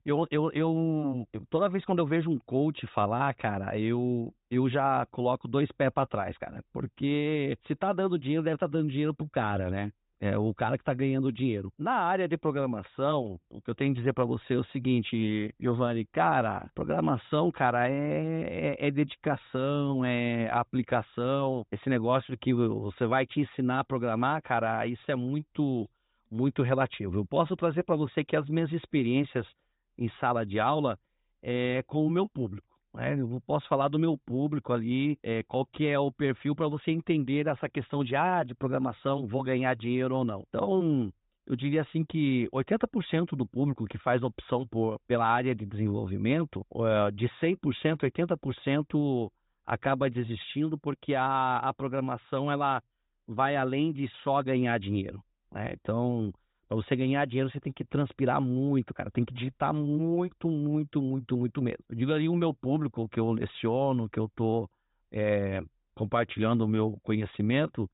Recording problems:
high frequencies cut off; severe; nothing above 4 kHz

